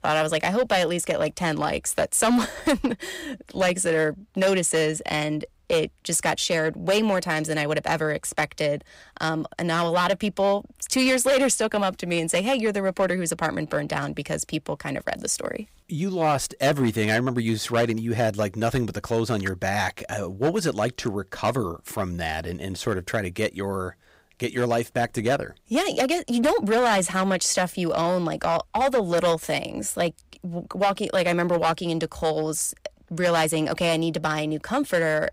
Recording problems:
distortion; slight; 6% of the sound clipped

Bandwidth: 15.5 kHz